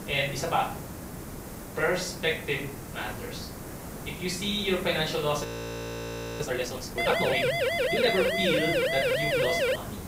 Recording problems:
off-mic speech; far
room echo; slight; dies away in 0.5 s
hiss; loud; throughout; 10 dB below the speech
audio freezing; at 5.5 s for 1 s
siren; loud; from 7 s on; peak 5 dB above the speech

